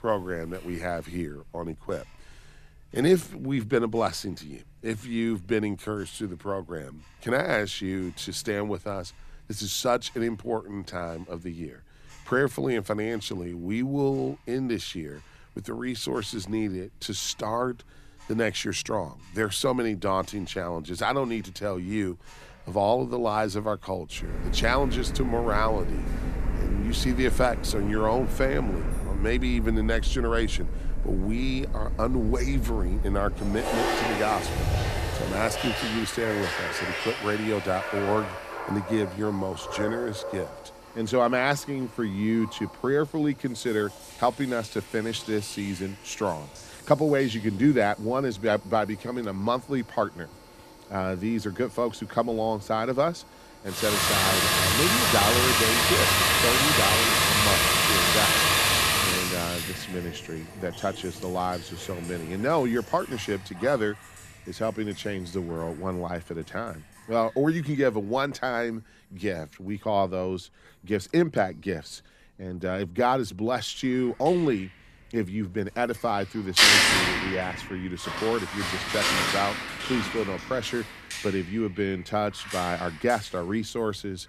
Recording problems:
household noises; very loud; throughout; 4 dB above the speech

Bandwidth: 14 kHz